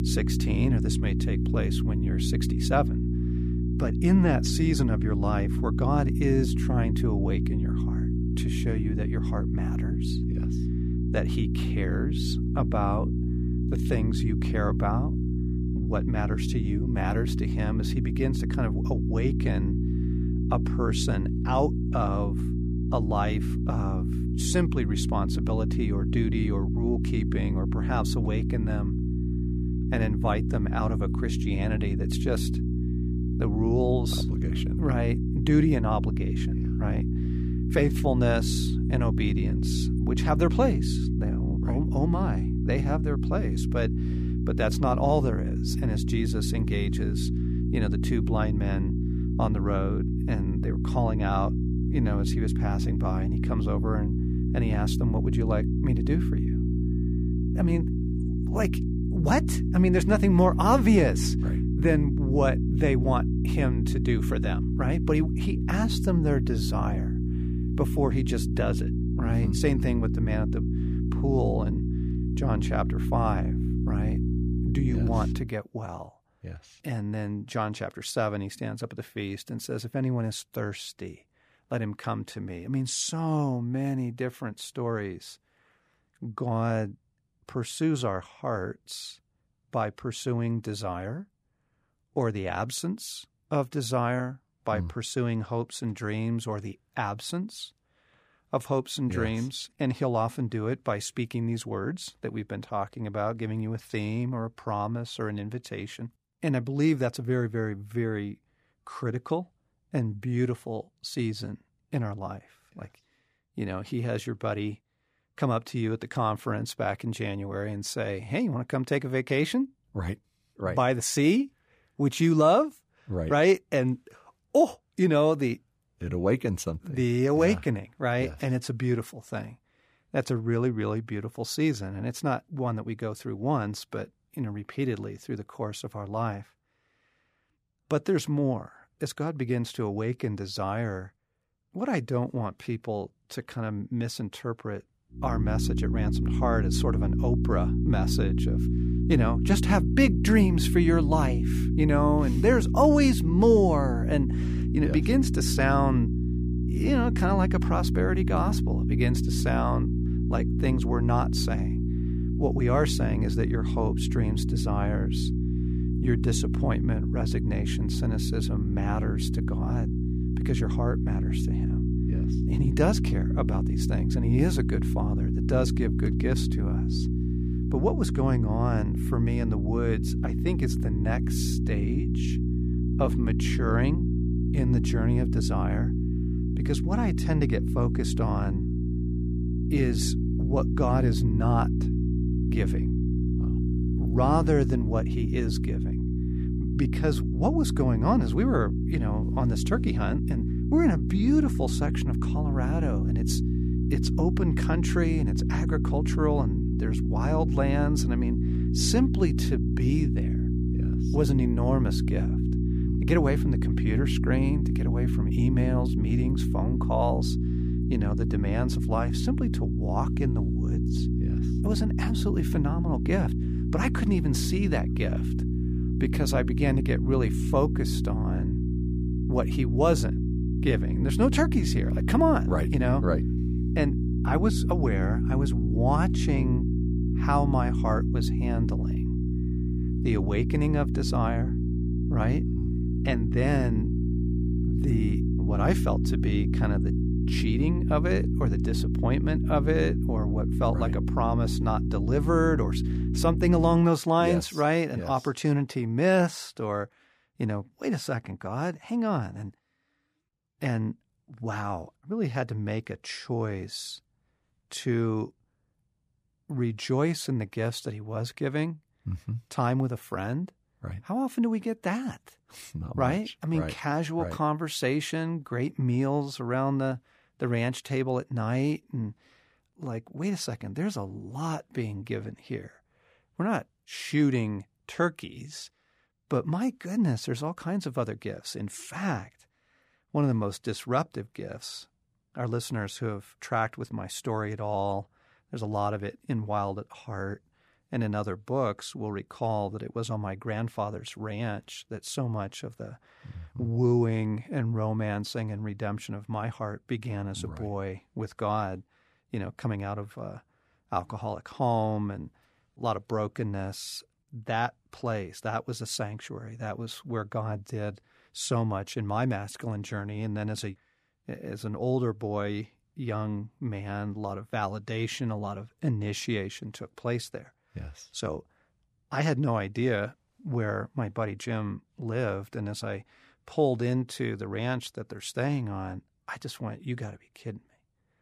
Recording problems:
electrical hum; loud; until 1:15 and from 2:25 to 4:14; 60 Hz, 5 dB below the speech

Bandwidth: 15 kHz